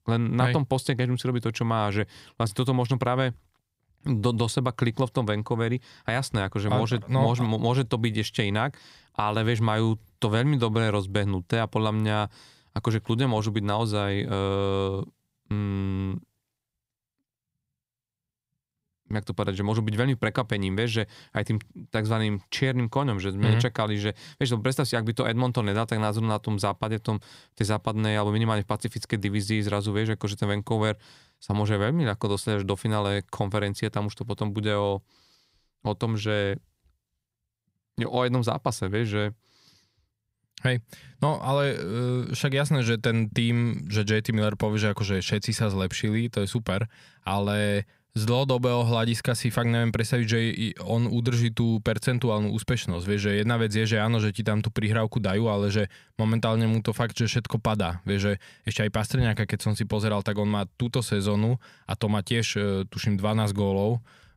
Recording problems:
none

